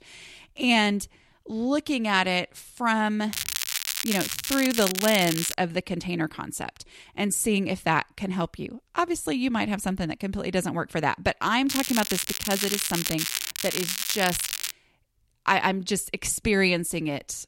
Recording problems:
crackling; loud; from 3.5 to 4.5 s, at 4.5 s and from 12 to 15 s; 2 dB below the speech

